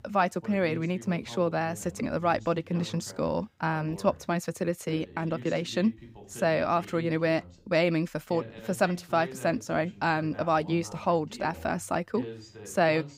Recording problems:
voice in the background; noticeable; throughout; 15 dB below the speech

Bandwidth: 15.5 kHz